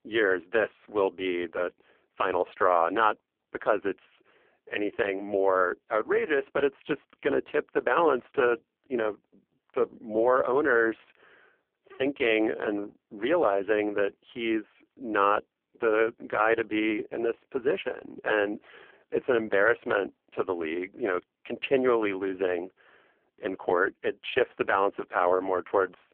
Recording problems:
phone-call audio; poor line

